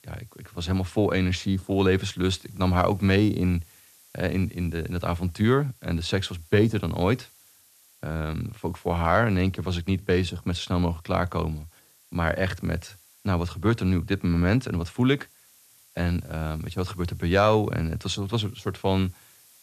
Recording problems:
hiss; faint; throughout; 30 dB below the speech

